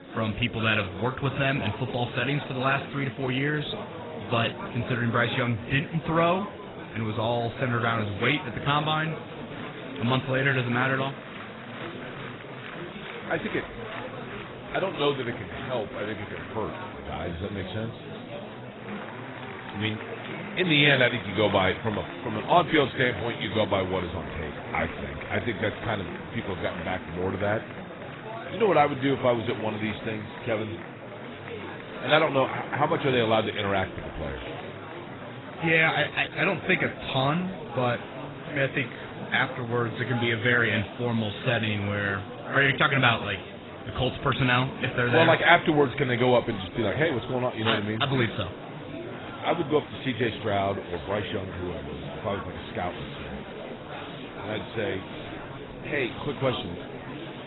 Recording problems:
garbled, watery; badly; nothing above 4 kHz
murmuring crowd; noticeable; throughout; 10 dB below the speech

